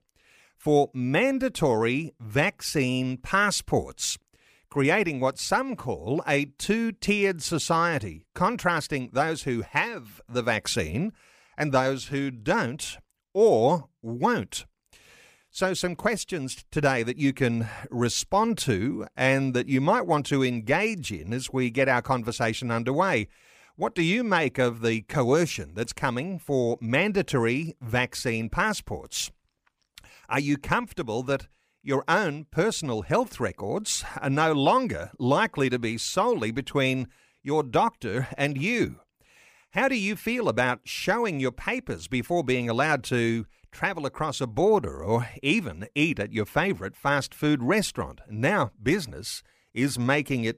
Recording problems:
none

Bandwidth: 15 kHz